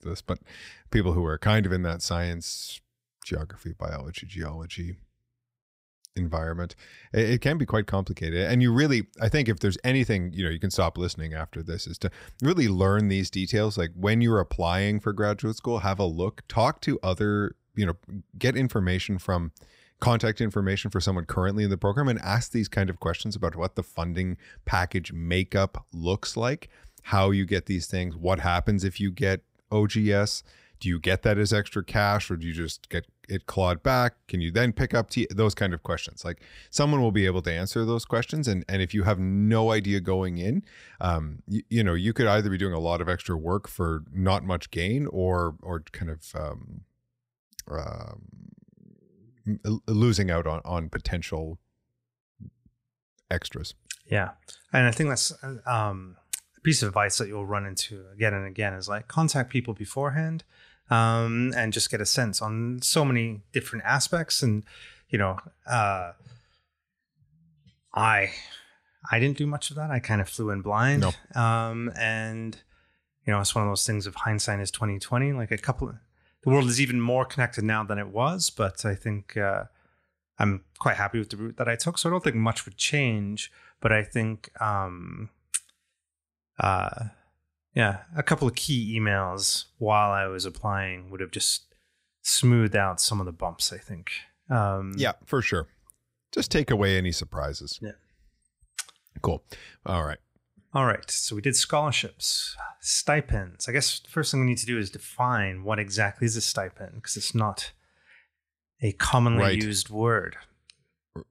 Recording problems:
none

